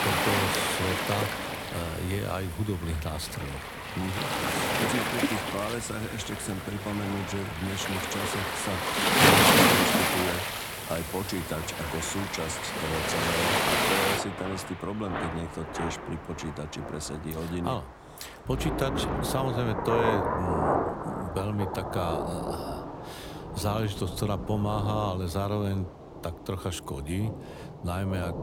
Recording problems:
rain or running water; very loud; throughout; 5 dB above the speech

